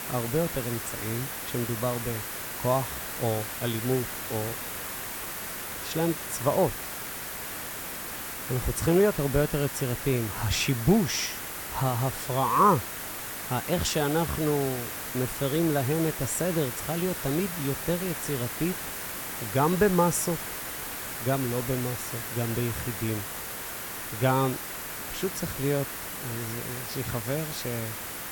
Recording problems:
hiss; loud; throughout; 5 dB below the speech

